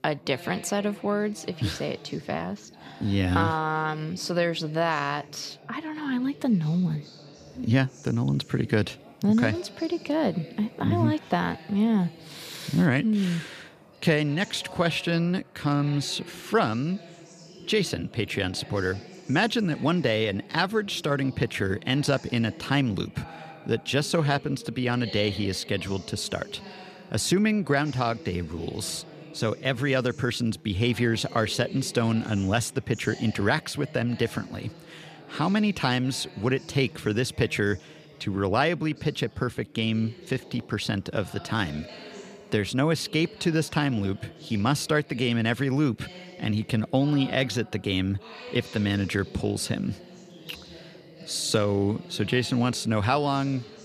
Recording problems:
background chatter; noticeable; throughout; 4 voices, 20 dB below the speech

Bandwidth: 14.5 kHz